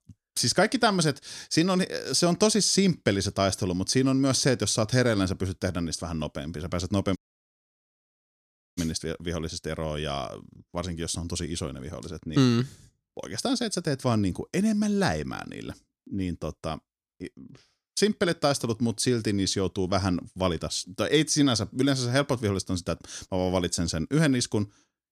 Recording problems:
audio cutting out; at 7 s for 1.5 s

